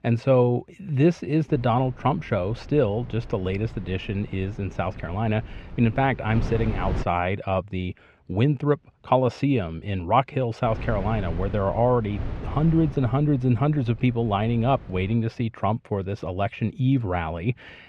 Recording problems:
muffled; slightly; fading above 2.5 kHz
wind noise on the microphone; occasional gusts; from 1.5 to 7 s and from 11 to 15 s; 20 dB below the speech

